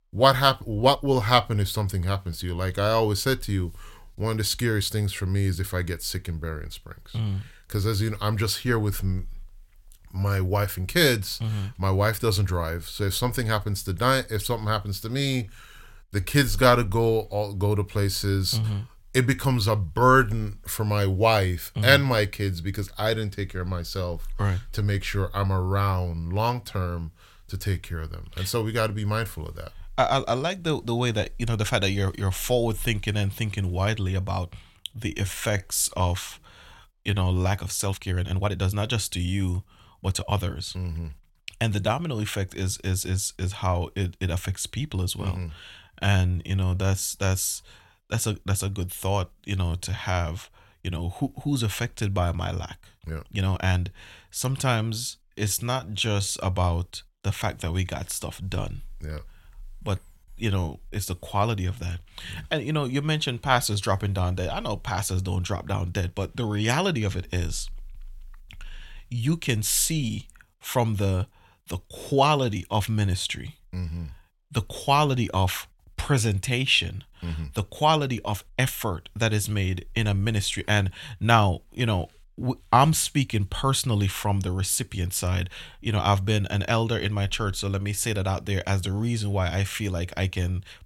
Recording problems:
uneven, jittery; strongly; from 0.5 s to 1:01

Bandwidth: 16.5 kHz